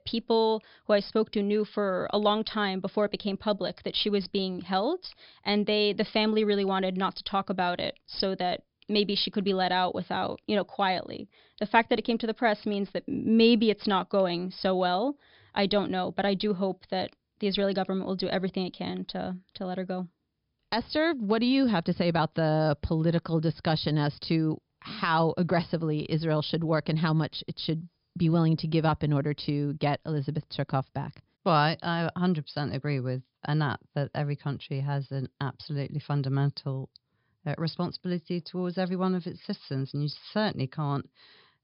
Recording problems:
high frequencies cut off; noticeable; nothing above 5.5 kHz

